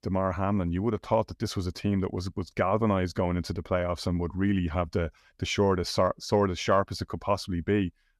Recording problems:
none

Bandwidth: 13.5 kHz